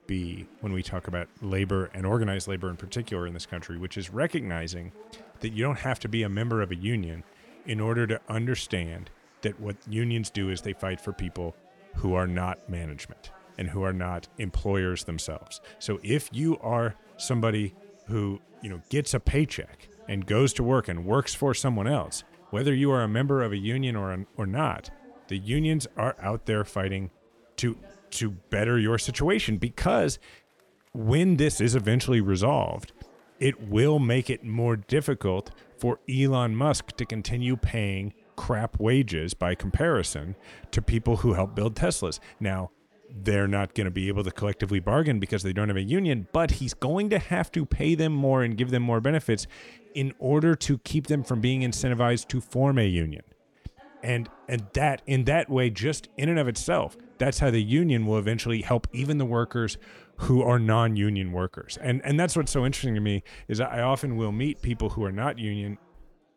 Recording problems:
chatter from many people; faint; throughout; 30 dB below the speech

